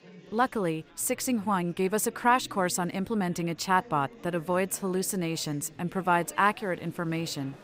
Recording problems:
chatter from many people; faint; throughout; 20 dB below the speech

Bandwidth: 15.5 kHz